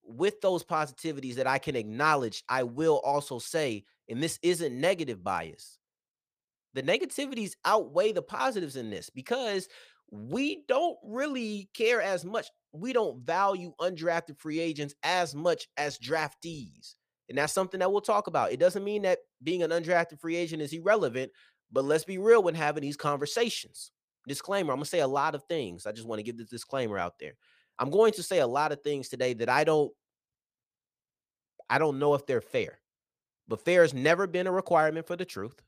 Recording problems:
none

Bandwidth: 15 kHz